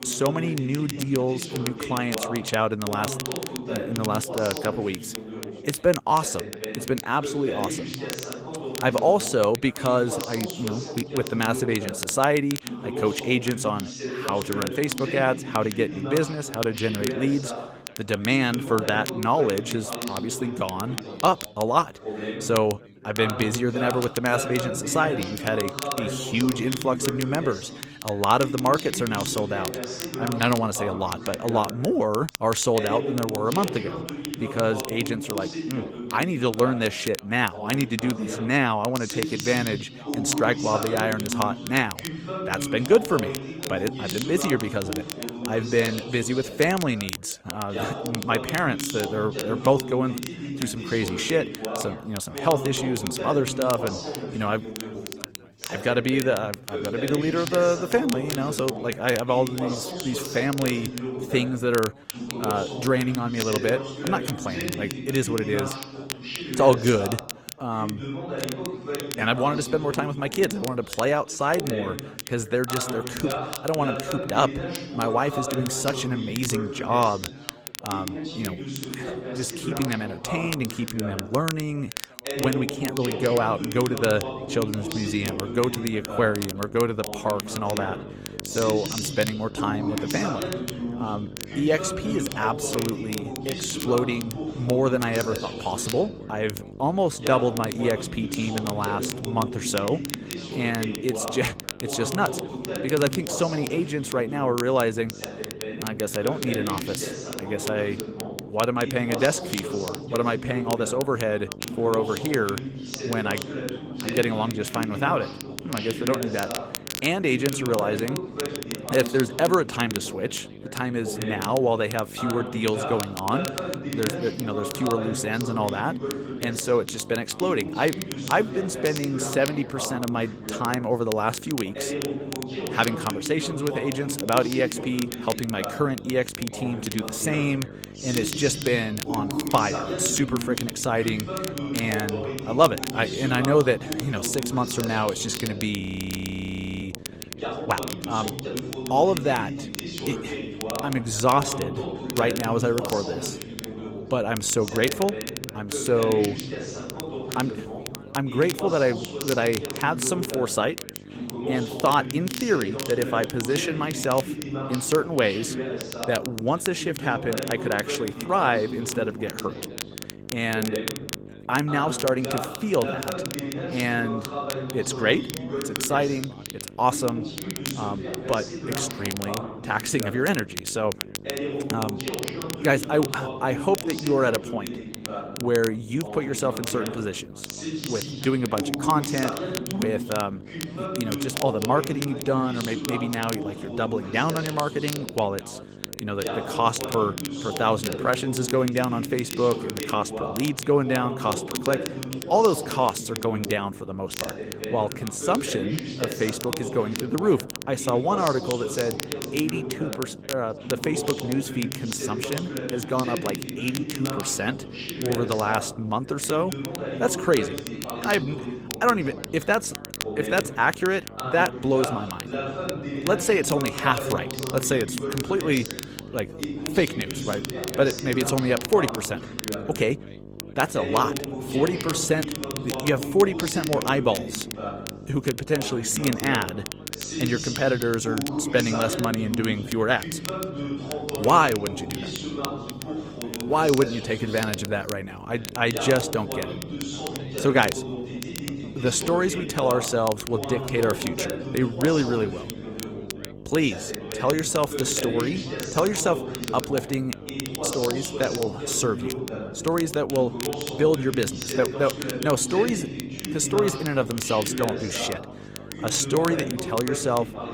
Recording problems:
garbled, watery; slightly; nothing above 17.5 kHz
background chatter; loud; throughout; 3 voices, 7 dB below the speech
crackle, like an old record; noticeable; 10 dB below the speech
electrical hum; faint; from 1:24 on; 50 Hz, 20 dB below the speech
audio freezing; at 2:26 for 1 s

